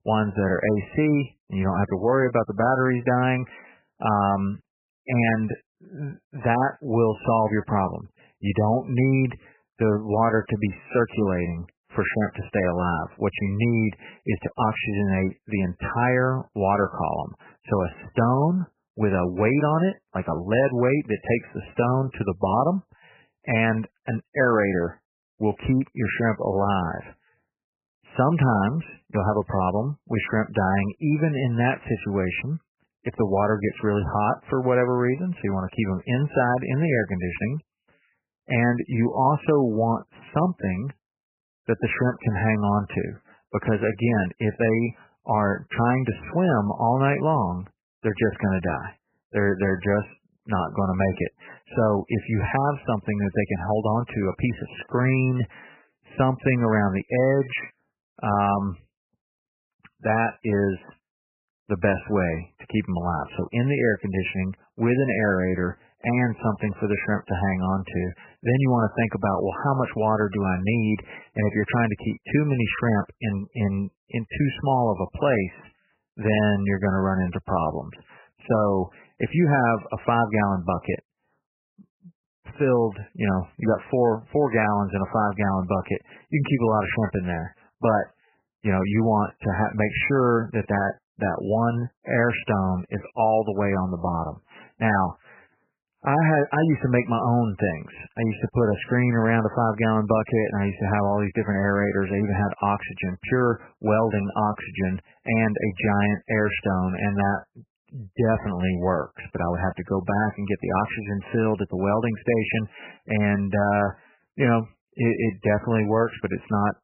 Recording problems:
garbled, watery; badly; nothing above 3 kHz

